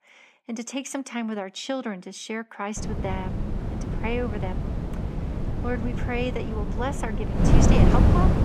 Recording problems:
wind noise on the microphone; heavy; from 3 s on; 1 dB below the speech

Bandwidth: 14 kHz